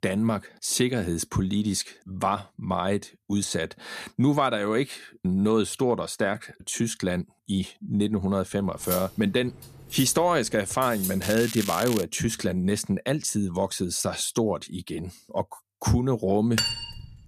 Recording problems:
crackling; loud; at 11 s; 7 dB below the speech
clattering dishes; noticeable; from 9 to 11 s; peak 5 dB below the speech
clattering dishes; loud; at 17 s; peak 1 dB above the speech

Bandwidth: 14.5 kHz